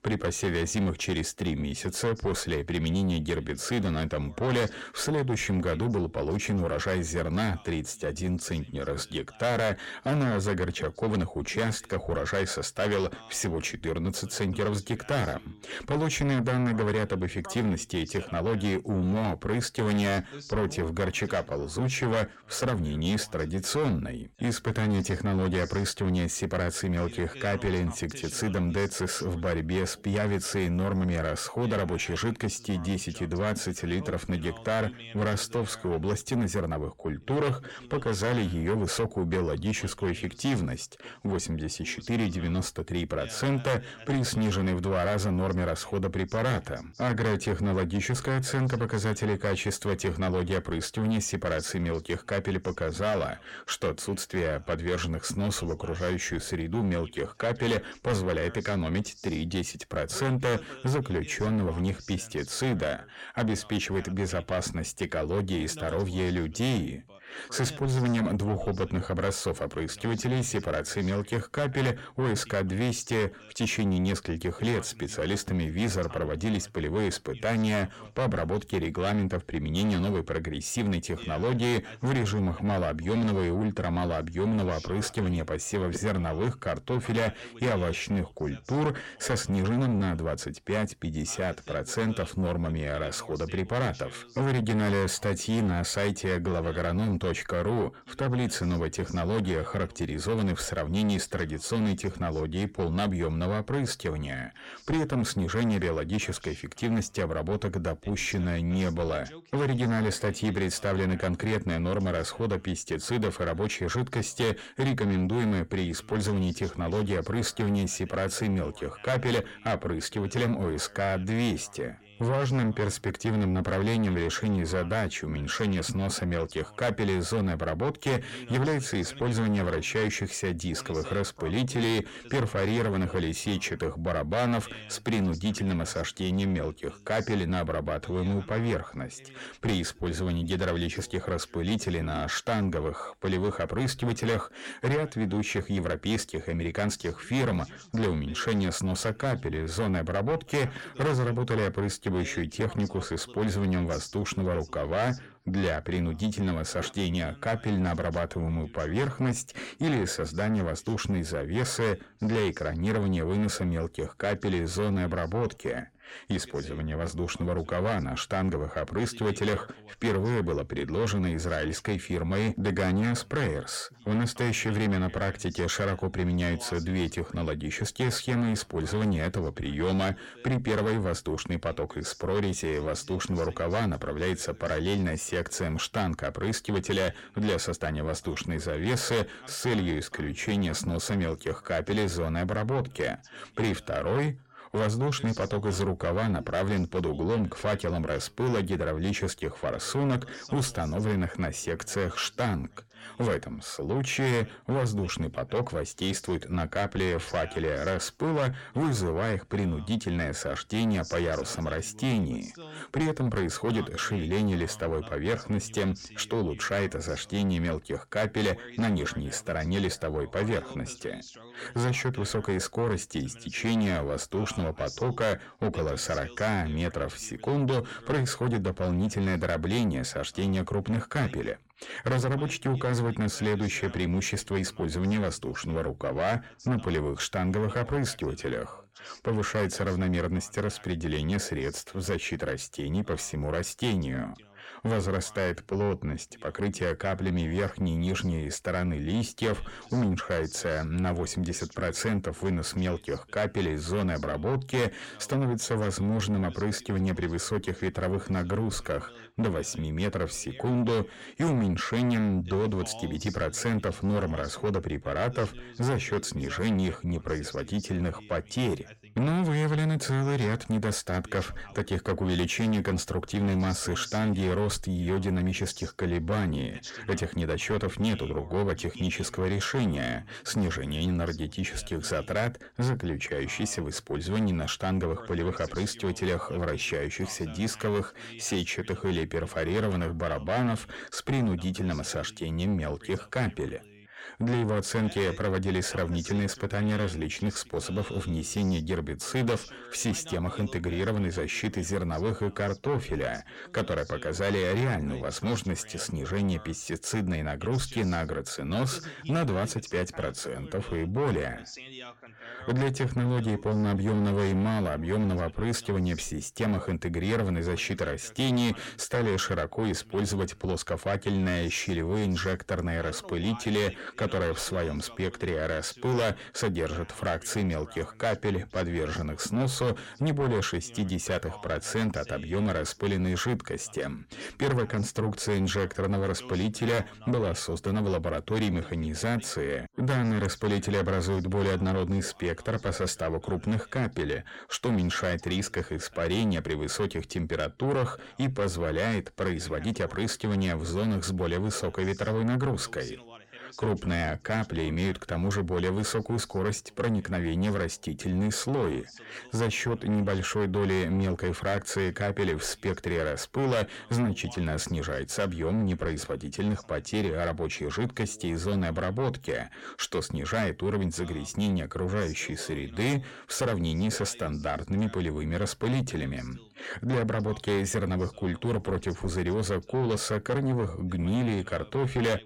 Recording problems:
distortion; heavy; 8 dB below the speech
voice in the background; faint; throughout; 20 dB below the speech

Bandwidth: 16.5 kHz